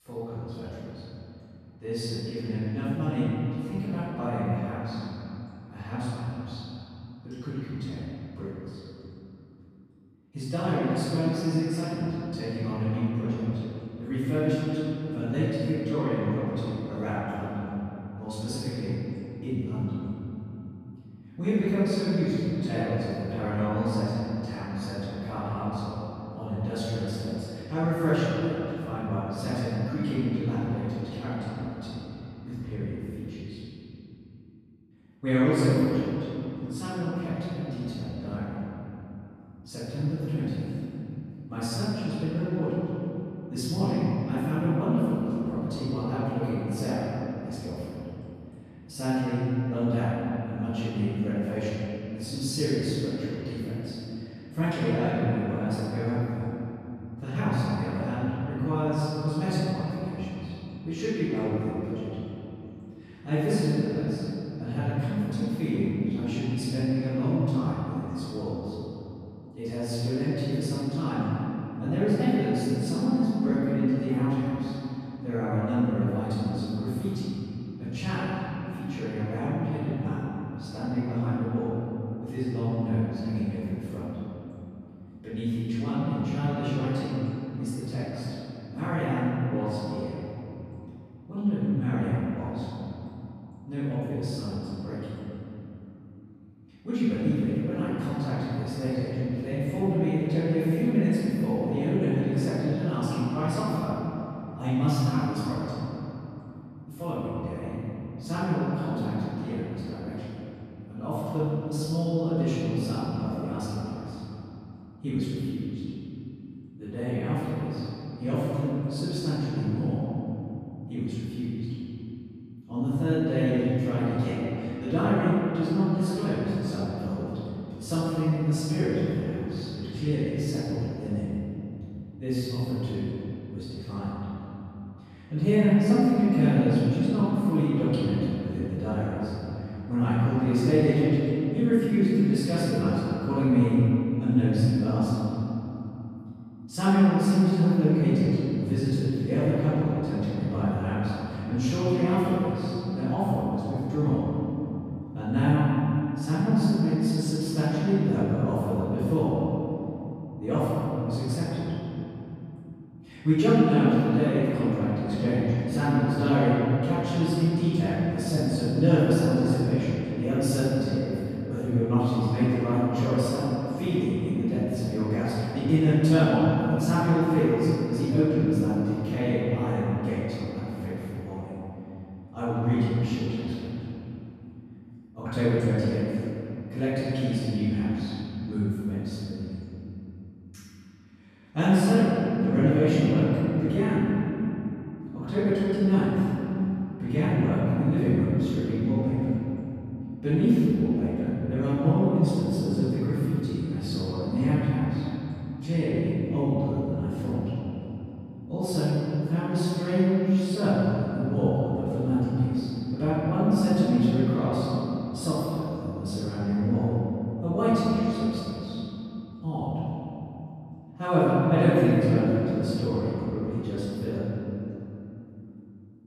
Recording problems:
echo of what is said; strong; throughout; 210 ms later, 10 dB below the speech
room echo; strong; dies away in 2.5 s
off-mic speech; far

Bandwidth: 14.5 kHz